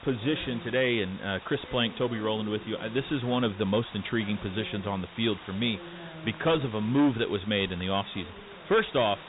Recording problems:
high frequencies cut off; severe; nothing above 4 kHz
distortion; slight; 4% of the sound clipped
voice in the background; noticeable; throughout; 20 dB below the speech
hiss; noticeable; throughout; 15 dB below the speech

